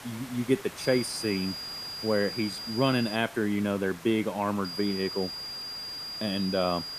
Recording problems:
high-pitched whine; loud; from 1 to 3 s and from 4.5 s on; 5 kHz, 6 dB below the speech
hiss; noticeable; throughout; 15 dB below the speech

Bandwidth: 14.5 kHz